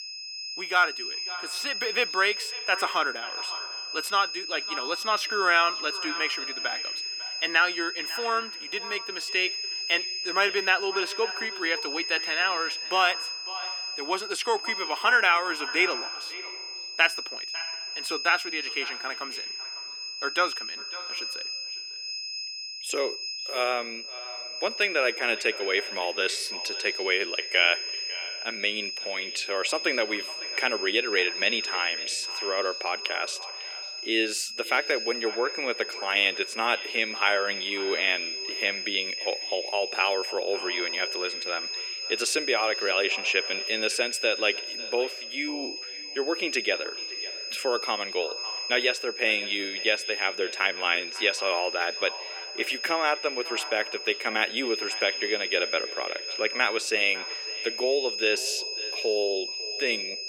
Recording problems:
thin; very; fading below 300 Hz
echo of what is said; noticeable; throughout; 550 ms later, 15 dB below the speech
high-pitched whine; loud; throughout; 5 kHz, 5 dB below the speech

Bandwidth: 17 kHz